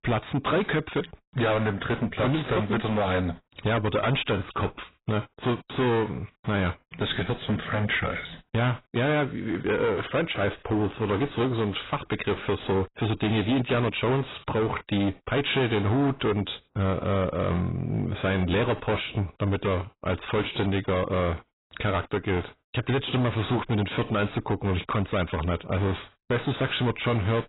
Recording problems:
distortion; heavy; 17% of the sound clipped
garbled, watery; badly; nothing above 4 kHz

